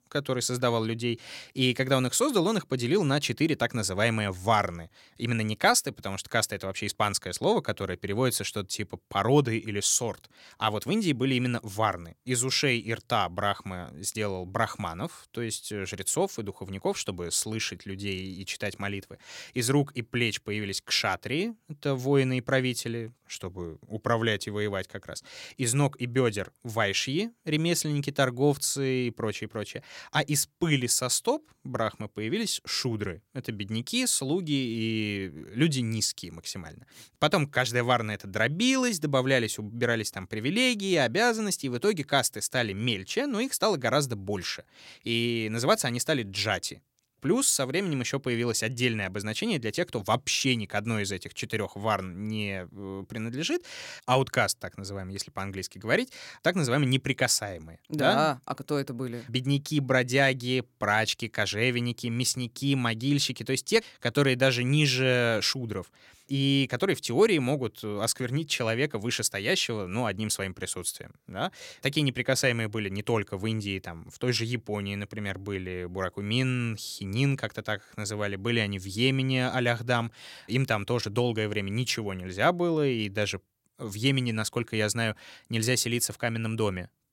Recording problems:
none

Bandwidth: 16.5 kHz